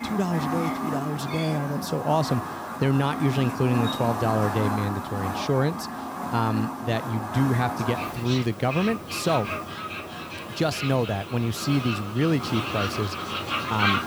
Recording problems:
animal sounds; loud; throughout; 4 dB below the speech

